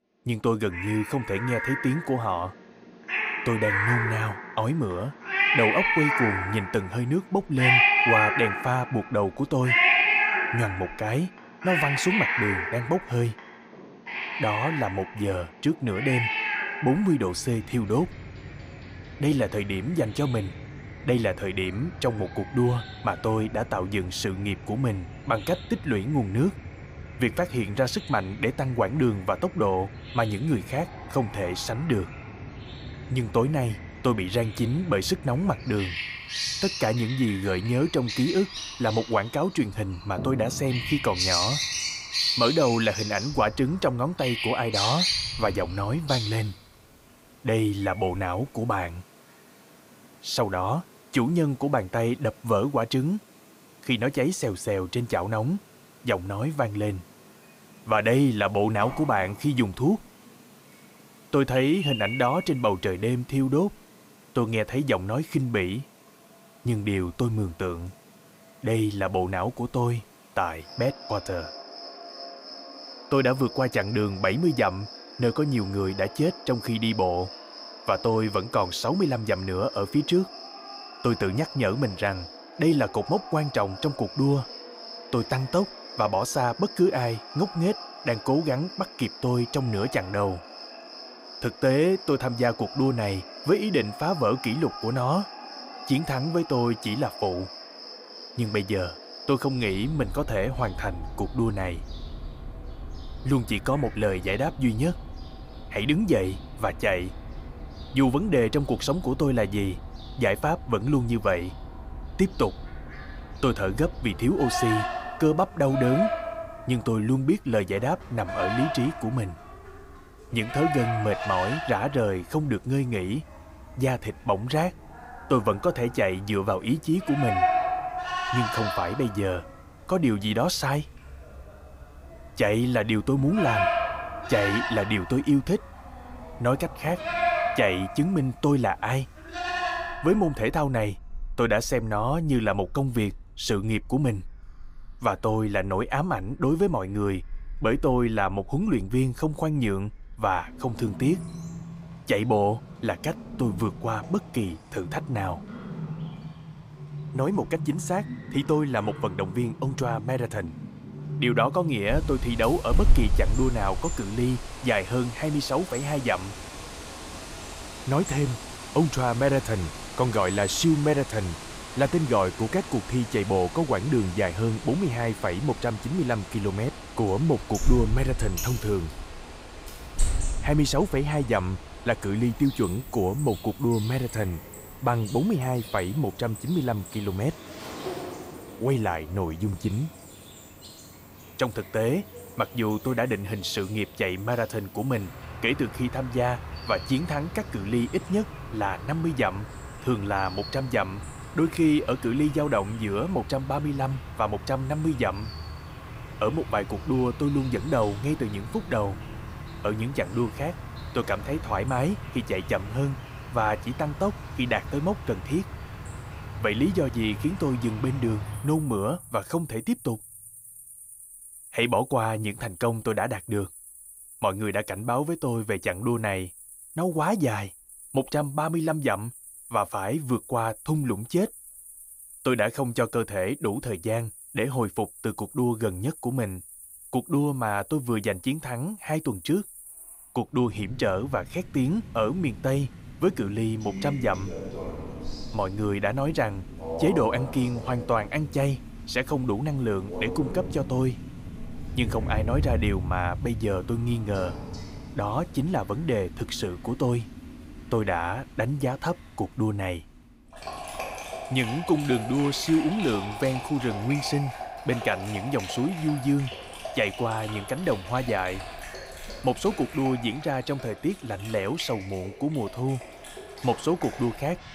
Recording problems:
animal sounds; loud; throughout; 7 dB below the speech

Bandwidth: 15.5 kHz